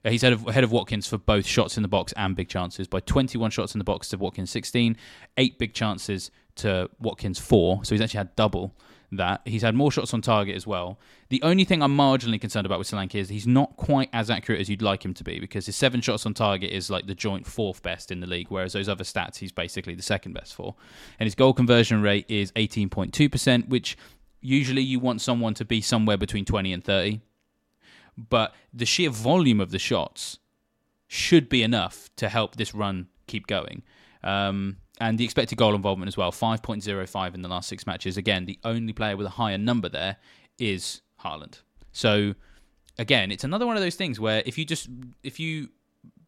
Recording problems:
none

